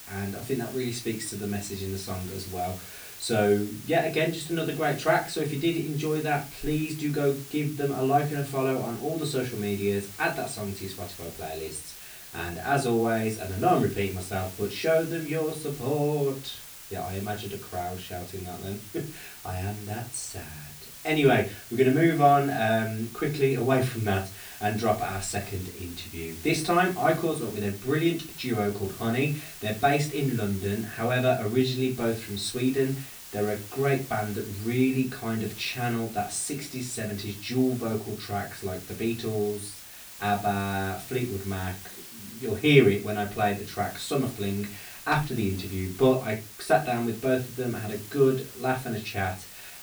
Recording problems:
off-mic speech; far
room echo; very slight; dies away in 0.3 s
hiss; noticeable; throughout; 15 dB below the speech

